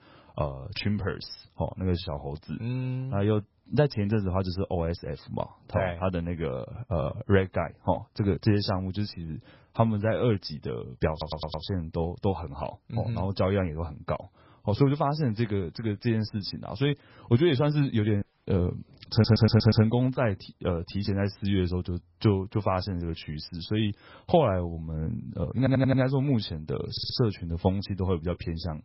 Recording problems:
garbled, watery; badly; nothing above 5.5 kHz
audio stuttering; 4 times, first at 11 s
audio cutting out; at 18 s

